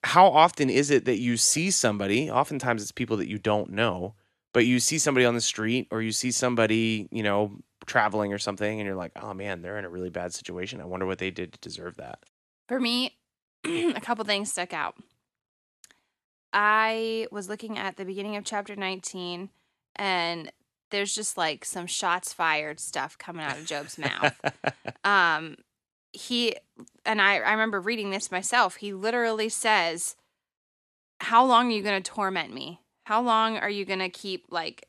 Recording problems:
none

